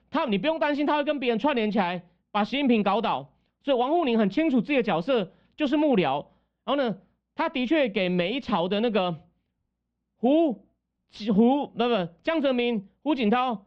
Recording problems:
muffled; very; fading above 3 kHz

